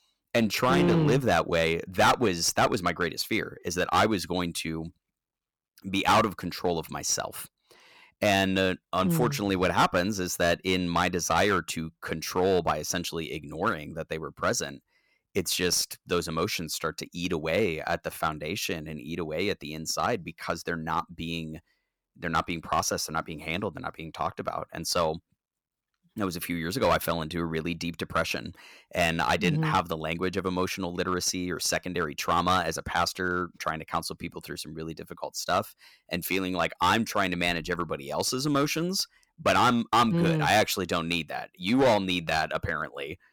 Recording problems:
distortion; slight; 3% of the sound clipped

